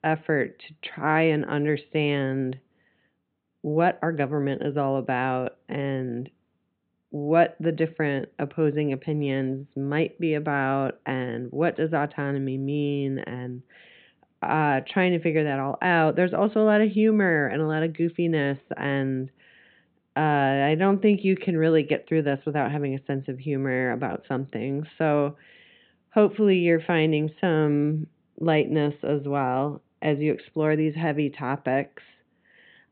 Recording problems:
high frequencies cut off; severe; nothing above 4 kHz

